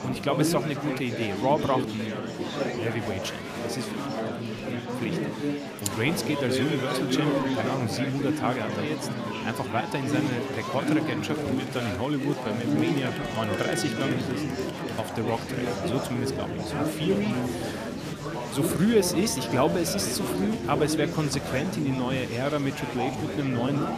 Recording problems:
murmuring crowd; loud; throughout; 1 dB below the speech

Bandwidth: 14.5 kHz